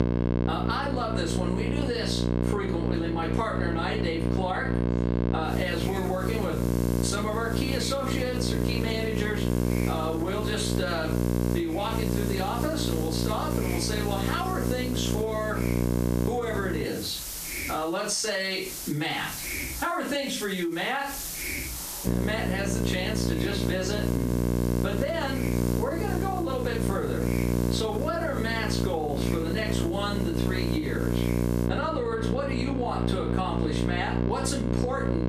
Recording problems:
off-mic speech; far
room echo; slight; dies away in 0.3 s
squashed, flat; somewhat
electrical hum; loud; until 17 s and from 22 s on; 60 Hz, 4 dB below the speech
hiss; loud; from 5.5 to 32 s; 9 dB below the speech

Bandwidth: 14.5 kHz